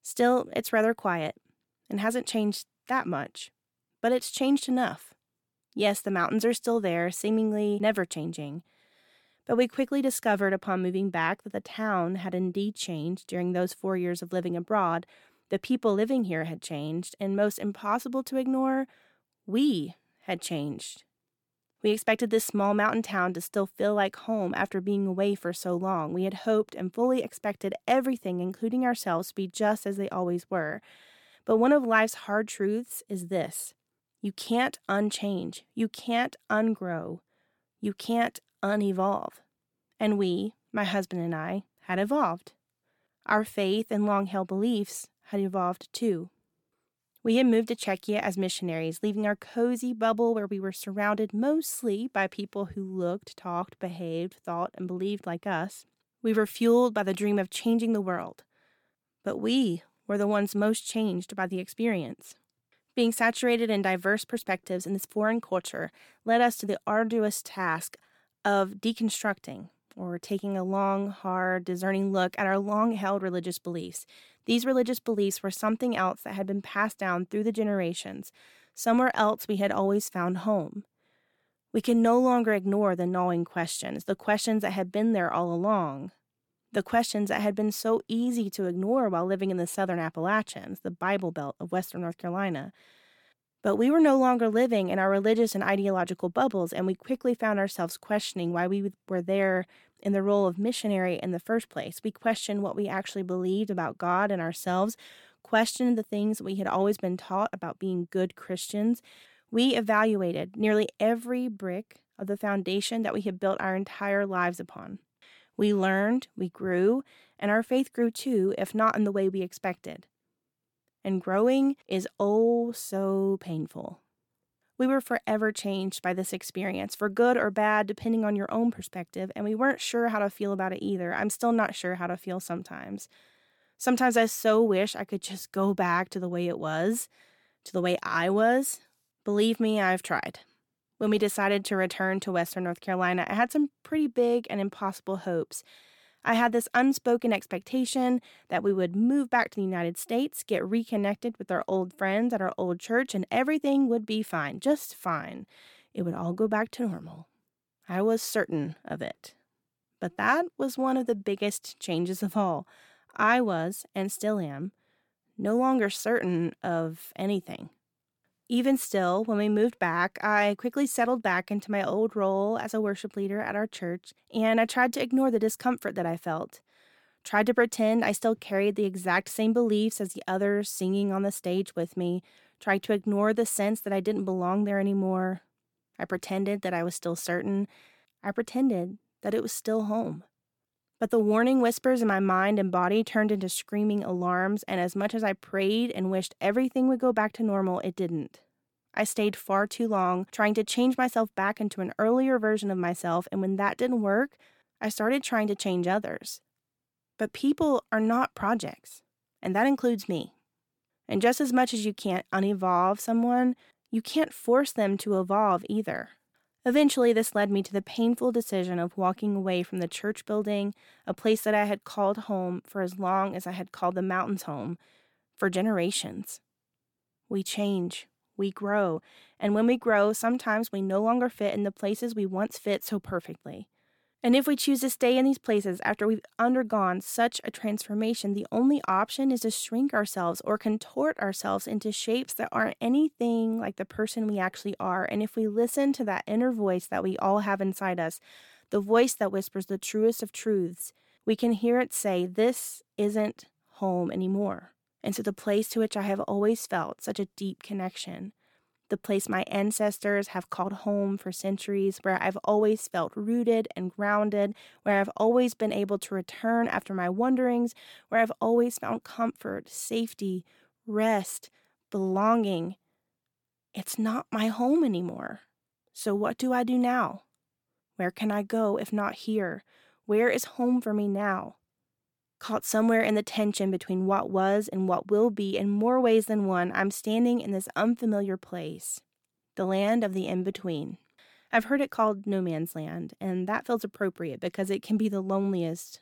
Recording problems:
none

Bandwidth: 17 kHz